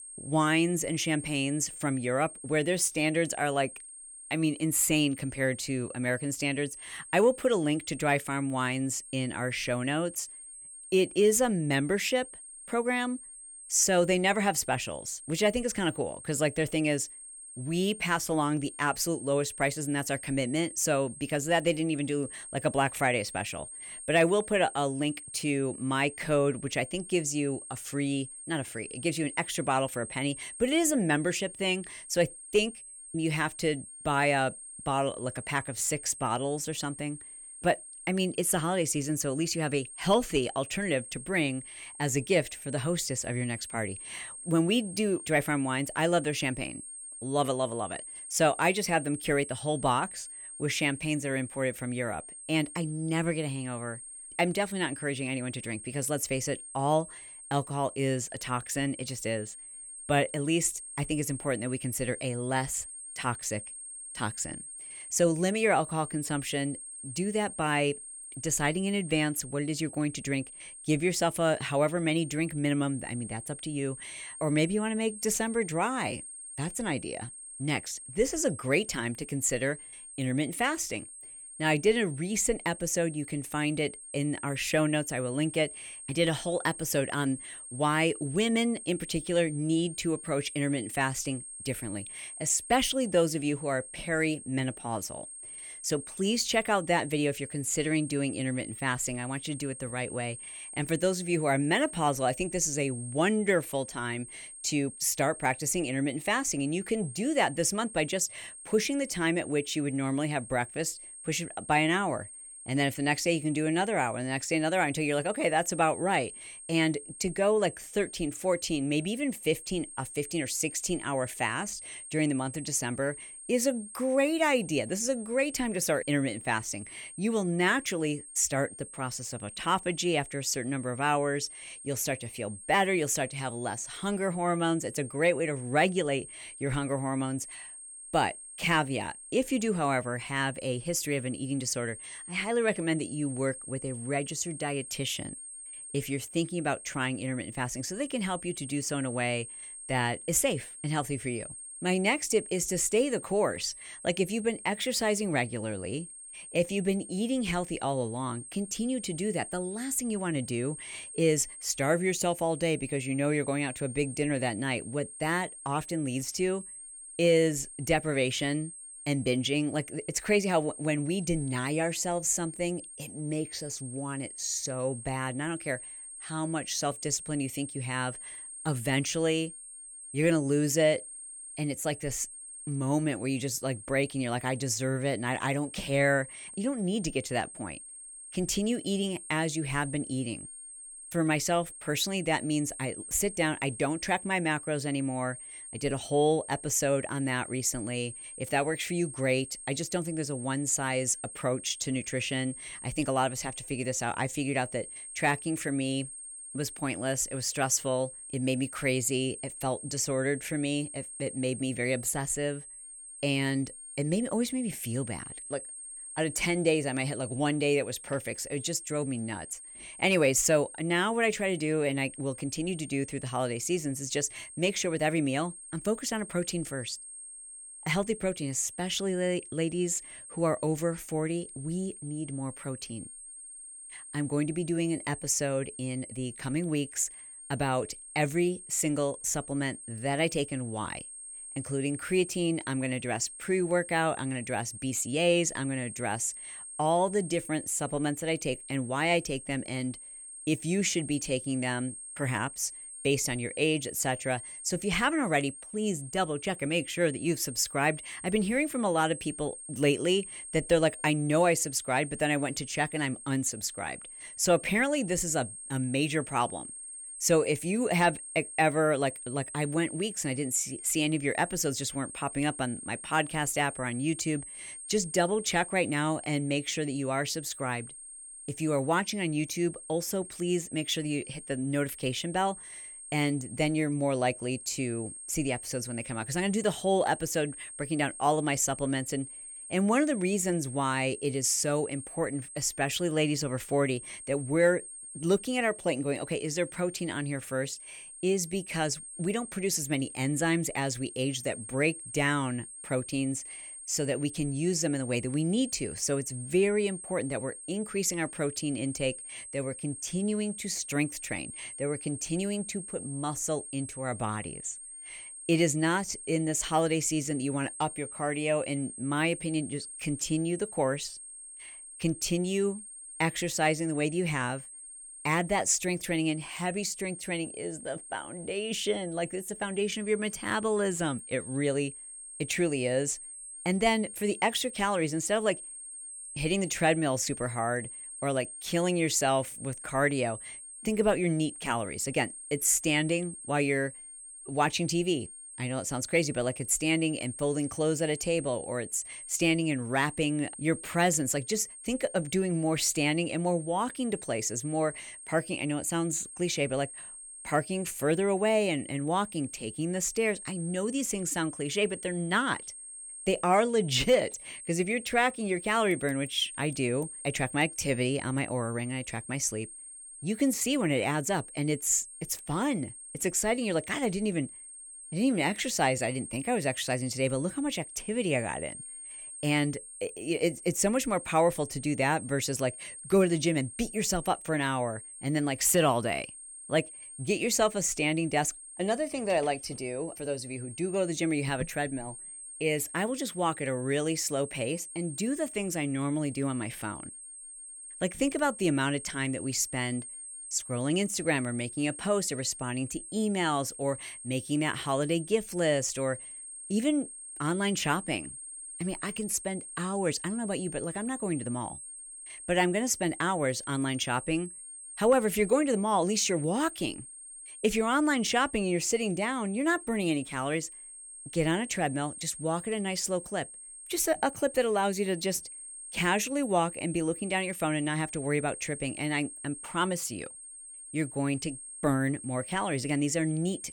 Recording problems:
high-pitched whine; noticeable; throughout; 8.5 kHz, 10 dB below the speech

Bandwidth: 17.5 kHz